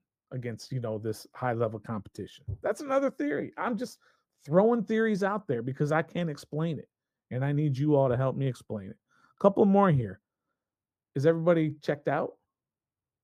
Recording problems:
muffled; very; fading above 2 kHz

